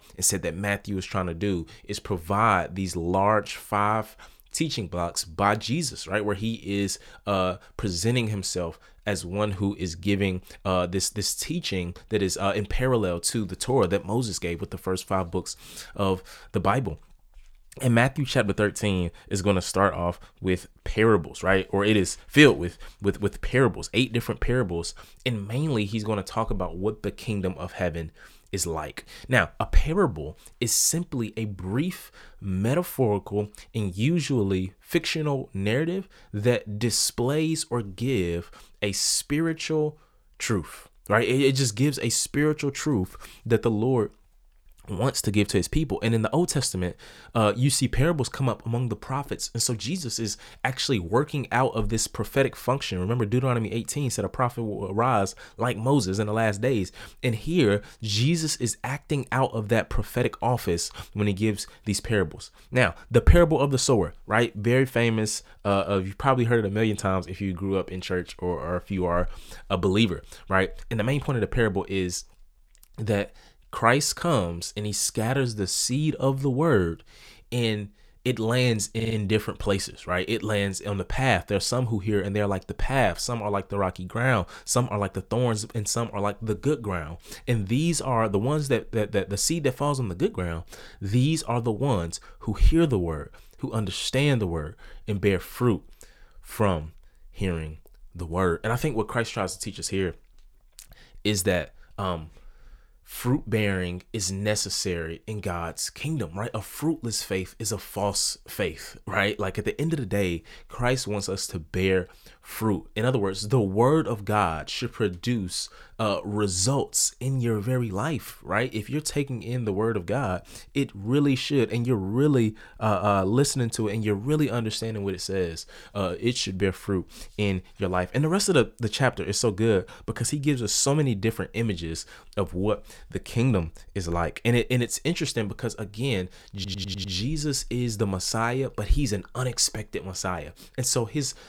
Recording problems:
audio stuttering; at 1:19 and at 2:17

